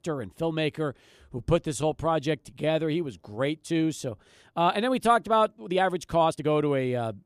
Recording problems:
uneven, jittery; strongly; from 1.5 to 6.5 s

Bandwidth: 14.5 kHz